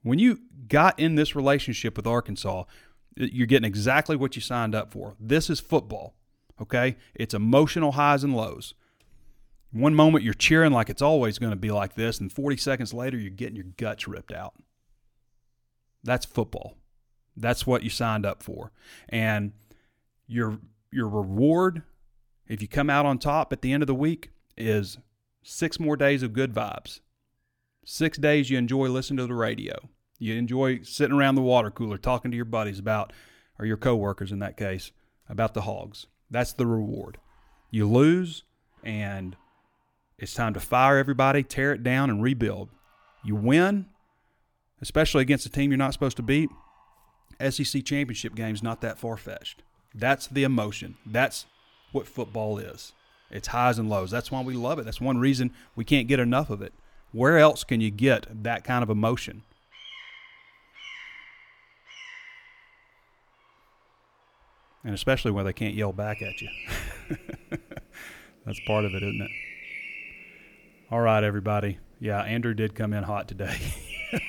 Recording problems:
animal sounds; noticeable; throughout; 15 dB below the speech

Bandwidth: 18.5 kHz